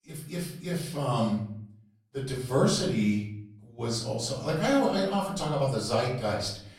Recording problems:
off-mic speech; far
room echo; noticeable; dies away in 0.6 s

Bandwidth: 17.5 kHz